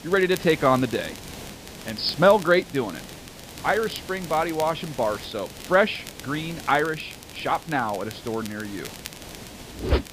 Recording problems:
high frequencies cut off; noticeable; nothing above 5.5 kHz
hiss; noticeable; throughout; 15 dB below the speech
crackle, like an old record; noticeable; 20 dB below the speech

